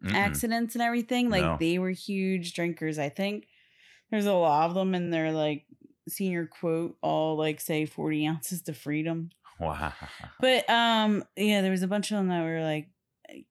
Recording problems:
uneven, jittery; strongly; from 1 to 12 s

